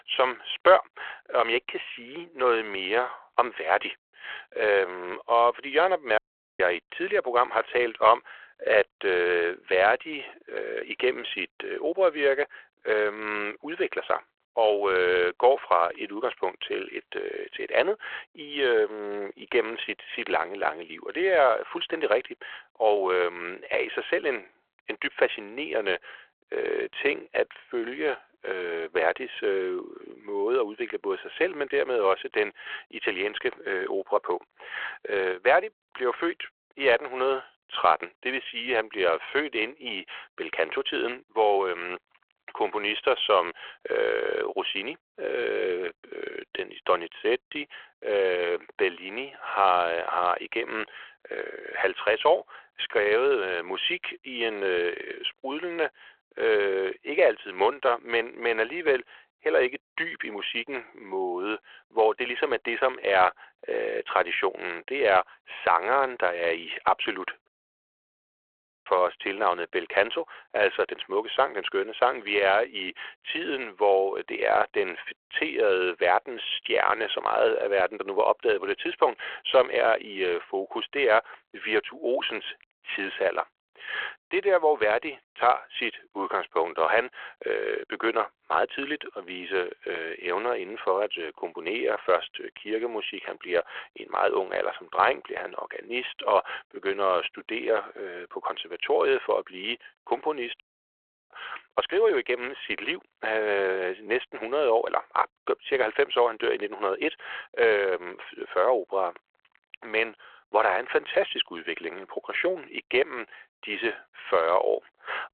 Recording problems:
phone-call audio
audio cutting out; at 6 s, at 1:07 for 1.5 s and at 1:41 for 0.5 s

